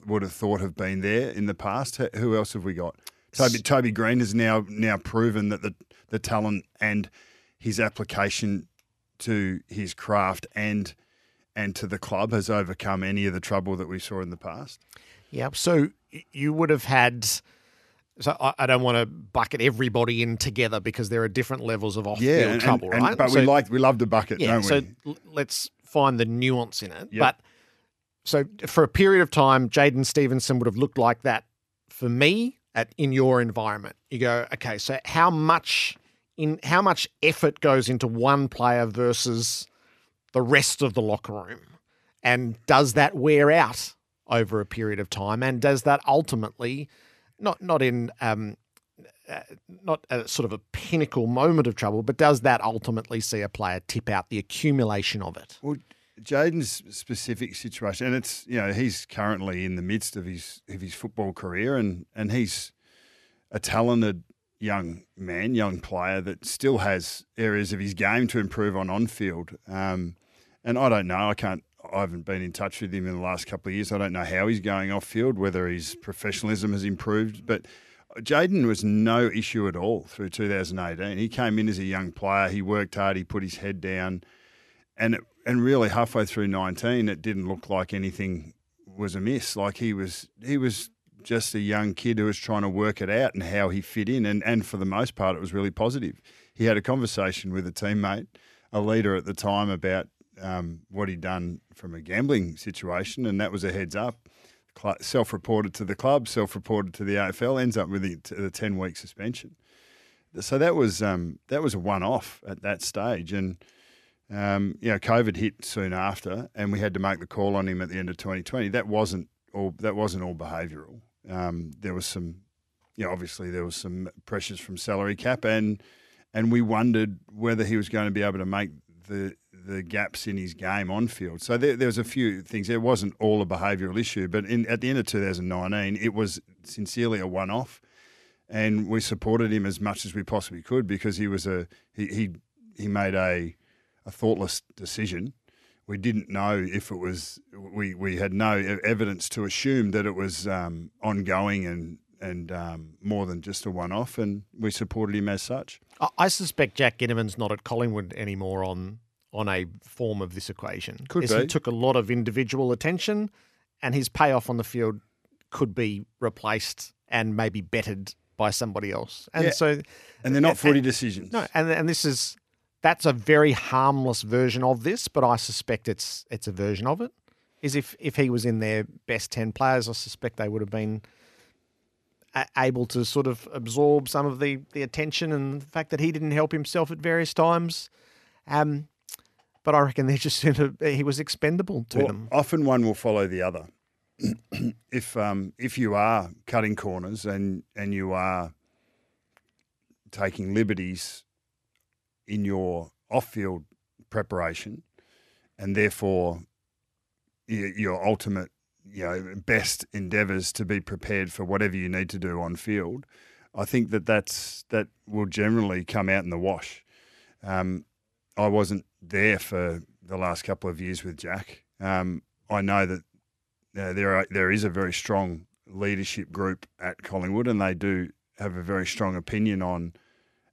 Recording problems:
none

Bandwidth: 13.5 kHz